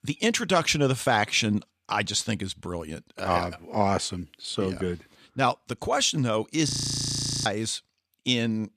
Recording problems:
audio freezing; at 6.5 s for 1 s

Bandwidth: 14.5 kHz